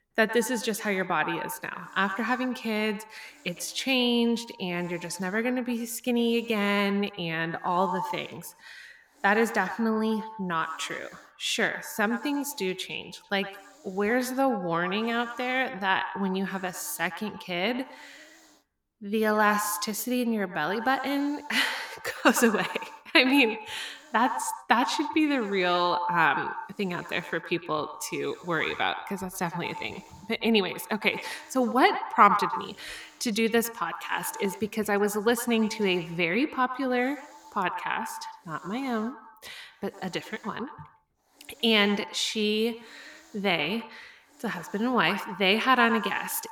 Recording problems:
echo of what is said; strong; throughout; 110 ms later, 10 dB below the speech
hiss; faint; throughout; 30 dB below the speech

